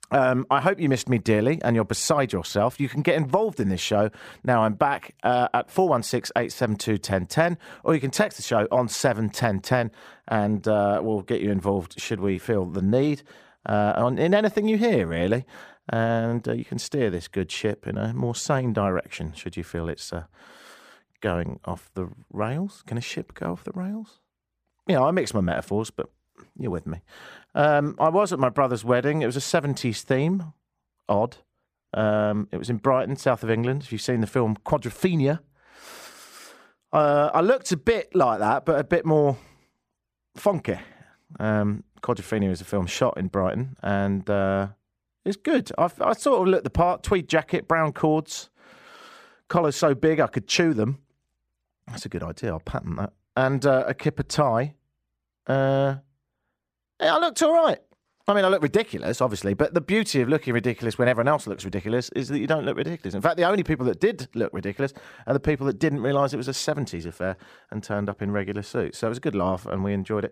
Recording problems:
none

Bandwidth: 15 kHz